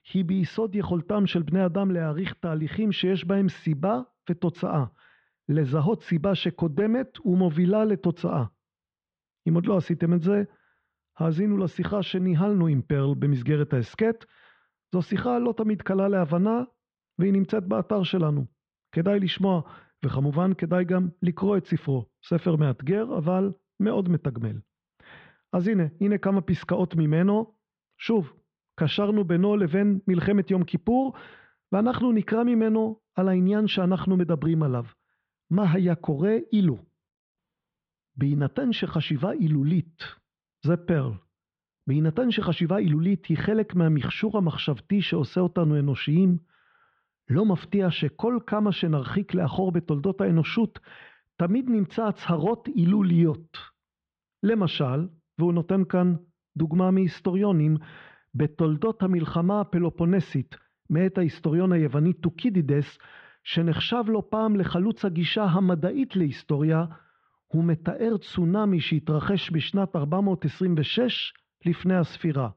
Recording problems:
muffled; very; fading above 3.5 kHz

